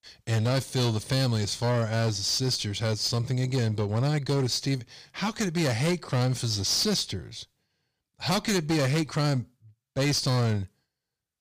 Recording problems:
distortion; slight; 12% of the sound clipped

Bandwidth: 15 kHz